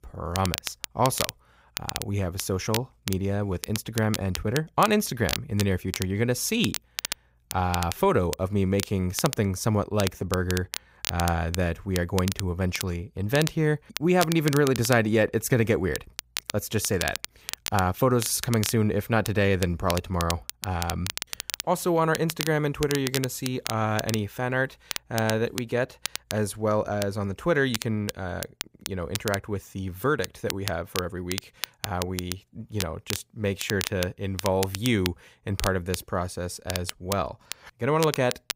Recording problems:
crackle, like an old record; loud; 8 dB below the speech

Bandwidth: 15.5 kHz